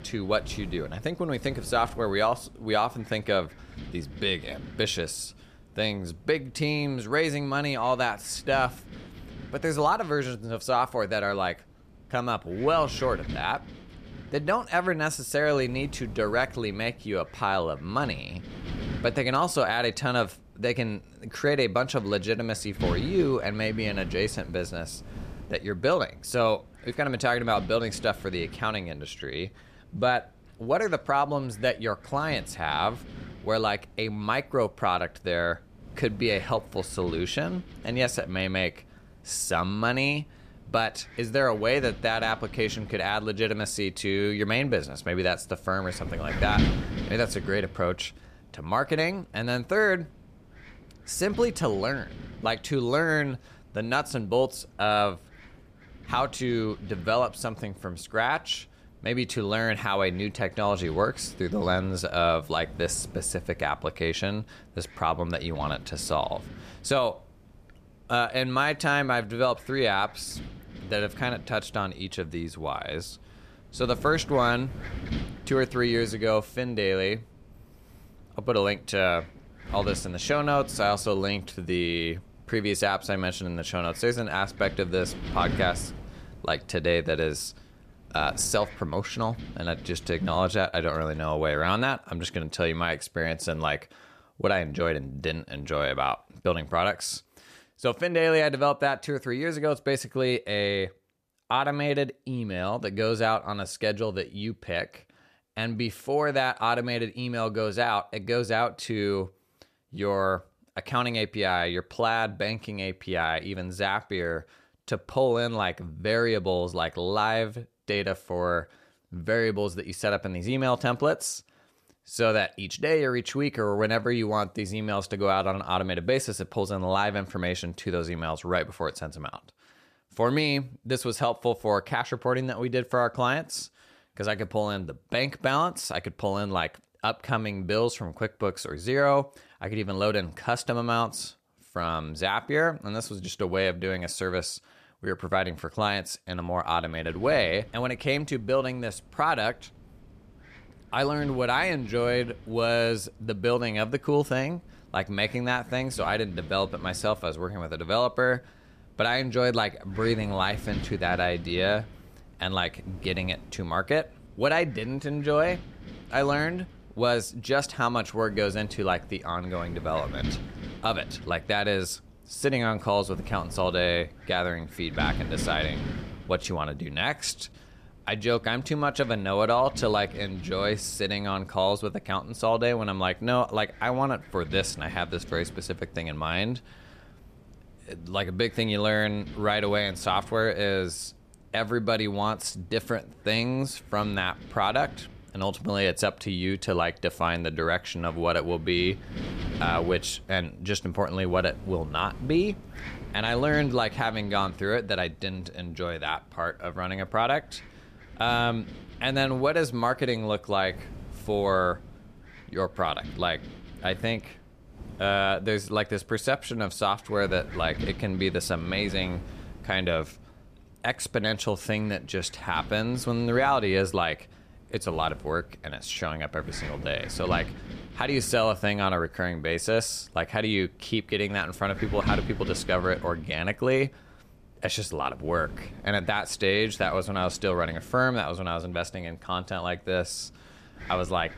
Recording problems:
wind noise on the microphone; occasional gusts; until 1:31 and from 2:27 on; 20 dB below the speech

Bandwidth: 14.5 kHz